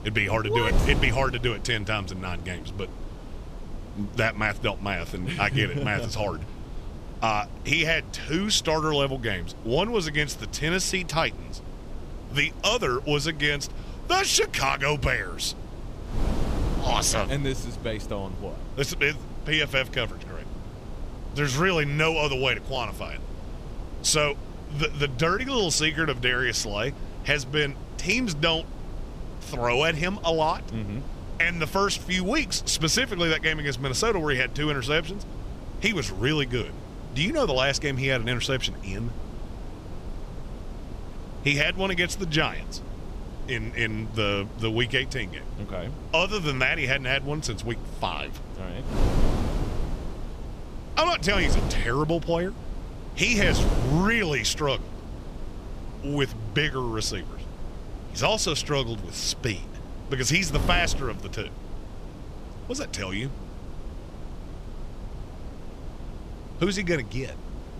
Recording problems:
wind noise on the microphone; occasional gusts; 20 dB below the speech

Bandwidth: 14.5 kHz